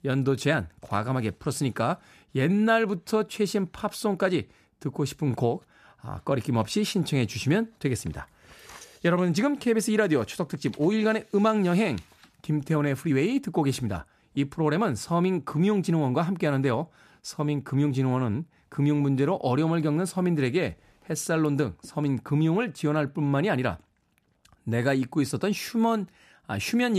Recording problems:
abrupt cut into speech; at the end

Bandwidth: 14.5 kHz